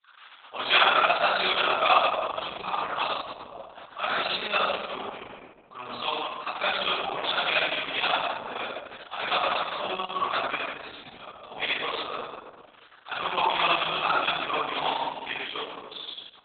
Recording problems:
off-mic speech; far
garbled, watery; badly; nothing above 4 kHz
thin; very; fading below 950 Hz
room echo; noticeable; dies away in 1.3 s

